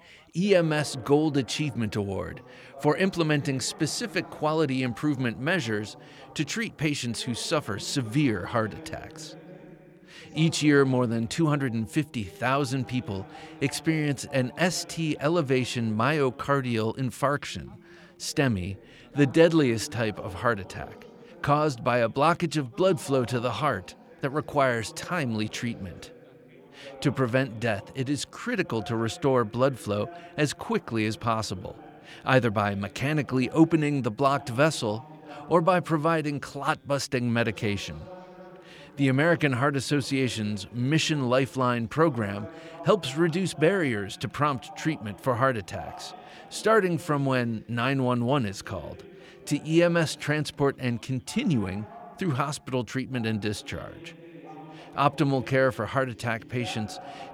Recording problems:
background chatter; faint; throughout; 2 voices, 20 dB below the speech

